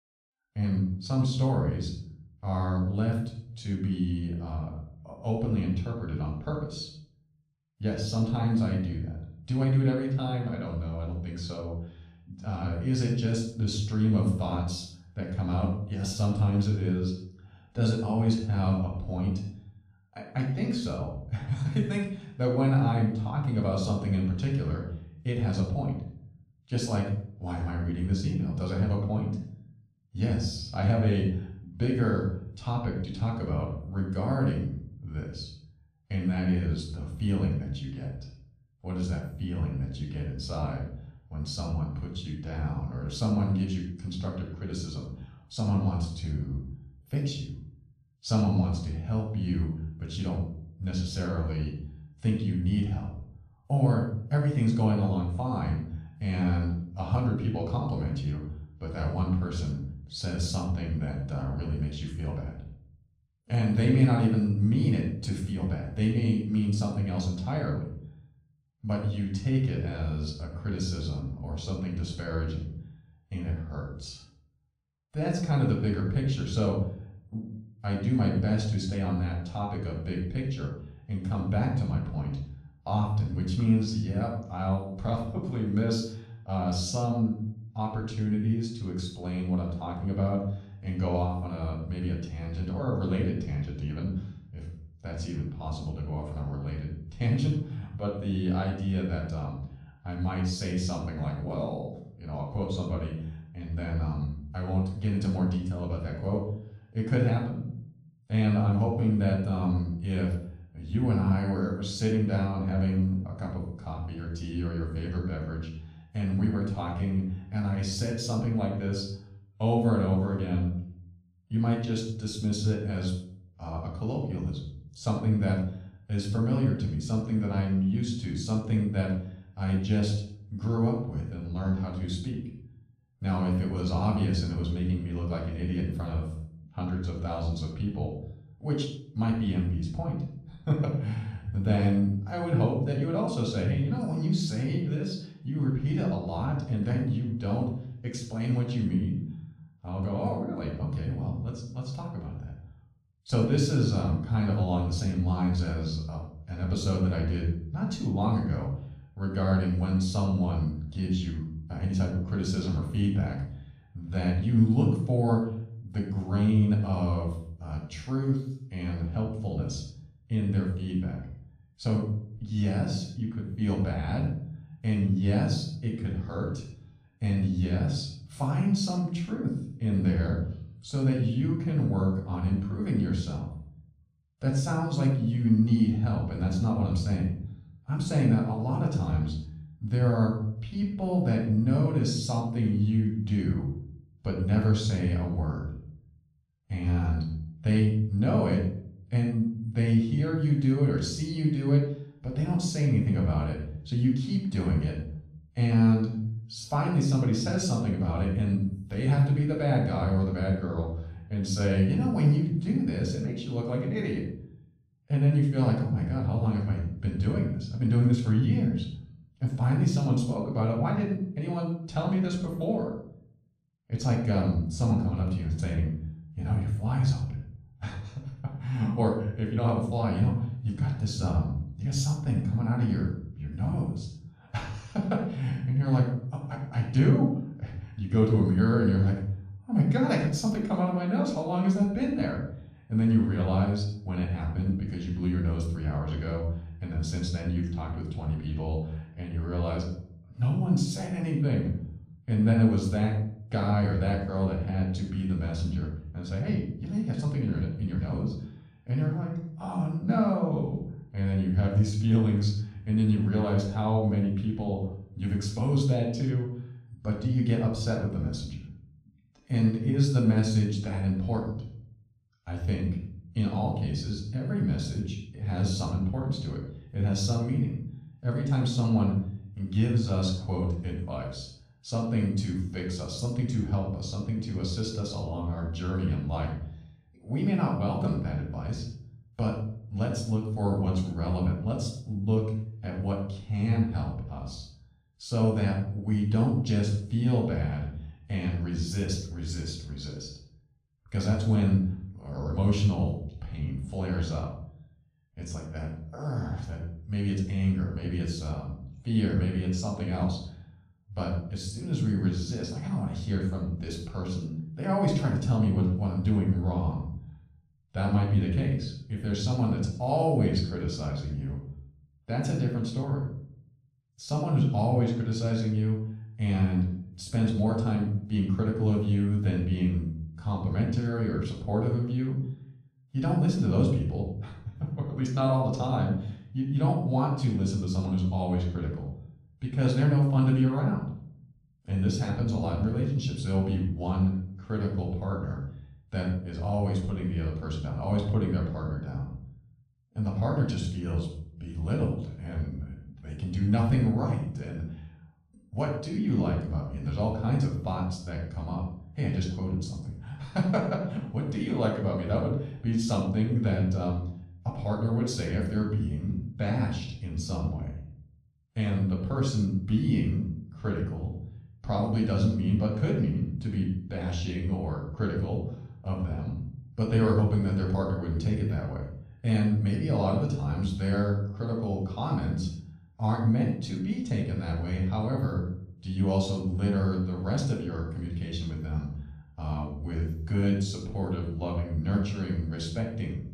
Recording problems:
off-mic speech; far
room echo; noticeable; dies away in 0.6 s

